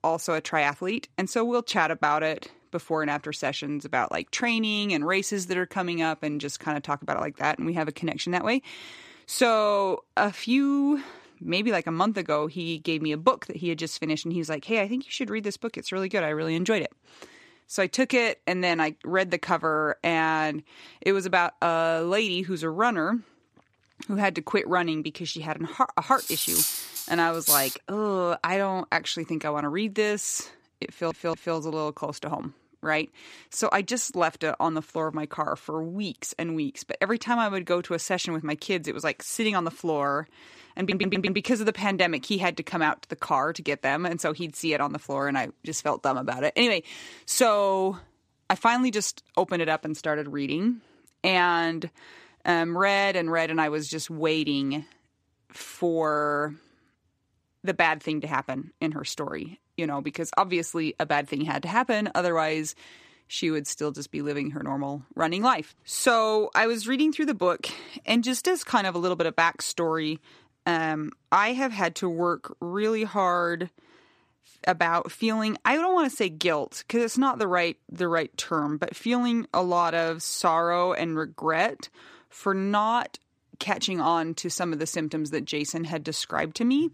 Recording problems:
clattering dishes; loud; from 26 to 28 s; peak 5 dB above the speech
audio stuttering; at 31 s and at 41 s

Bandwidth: 14.5 kHz